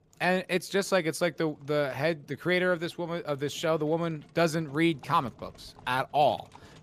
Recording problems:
animal sounds; faint; throughout; 25 dB below the speech

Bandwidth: 15 kHz